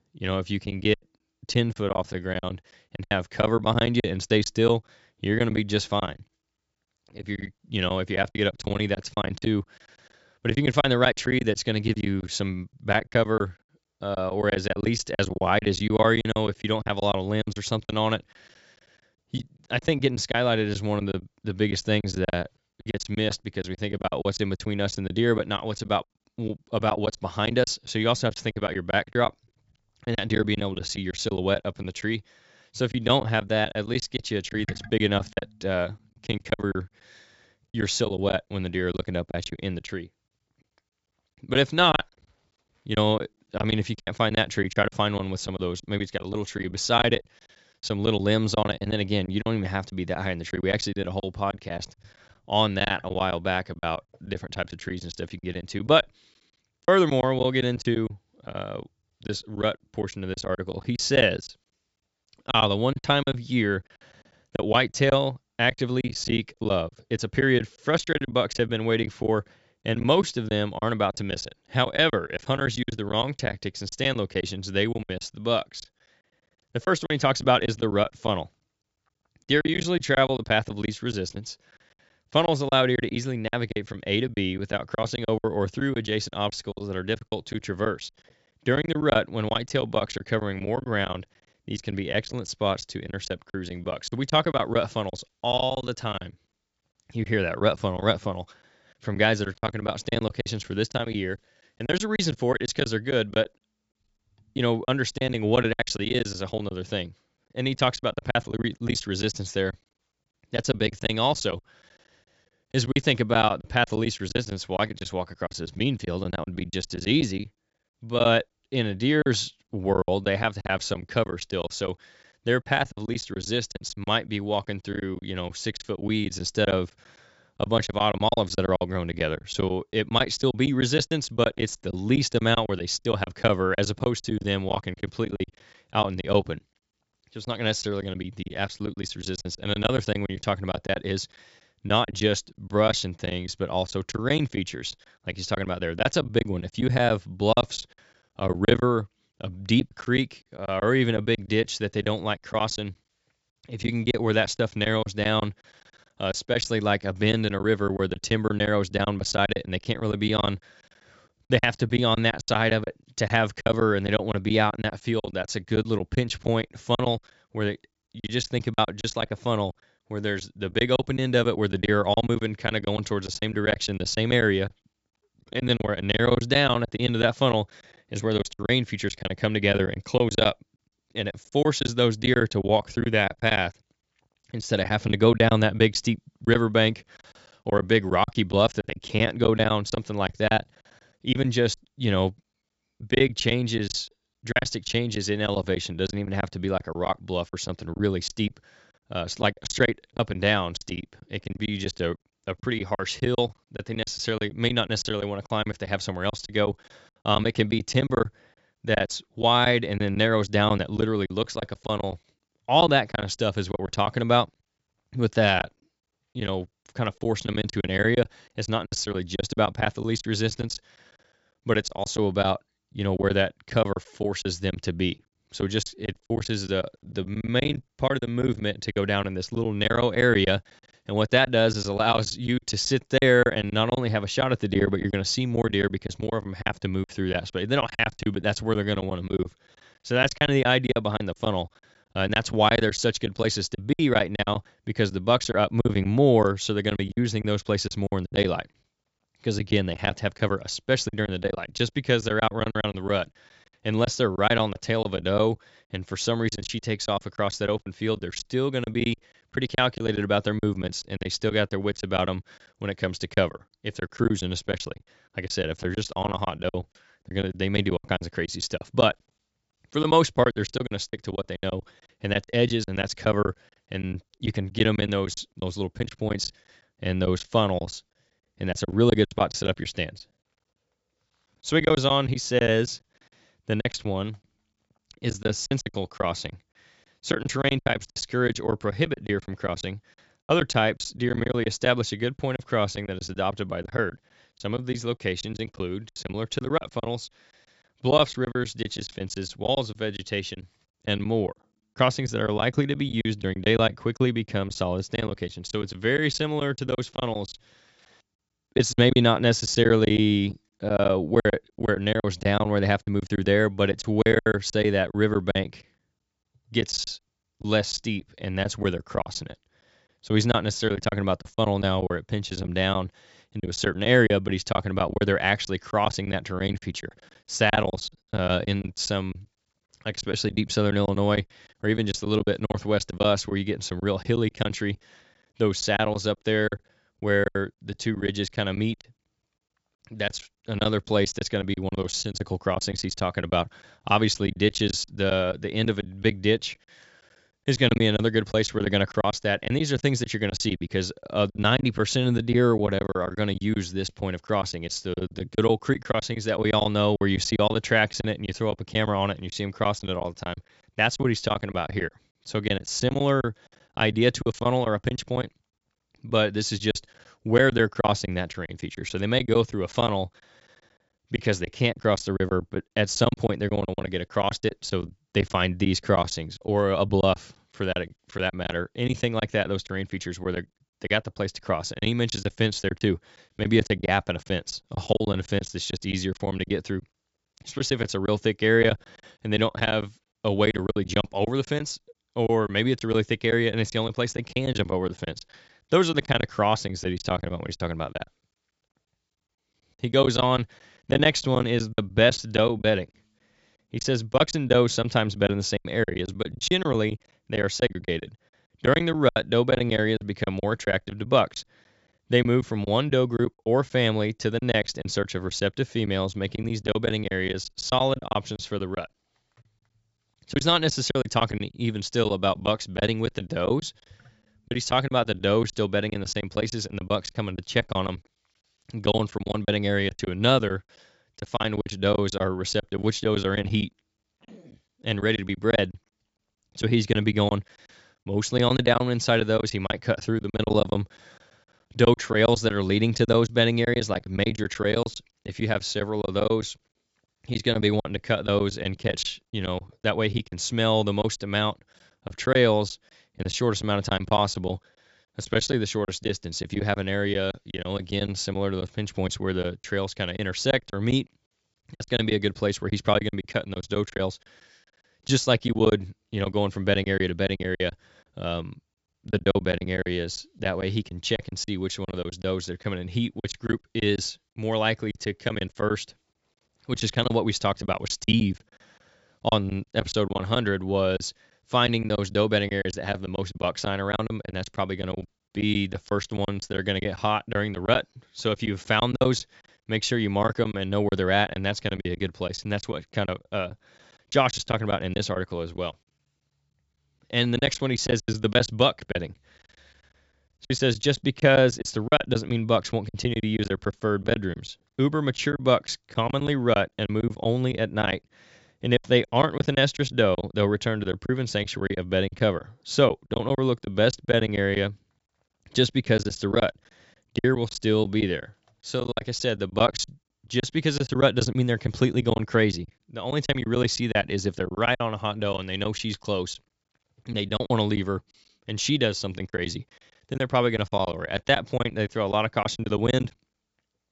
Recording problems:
high frequencies cut off; noticeable; nothing above 8 kHz
choppy; very; 13% of the speech affected

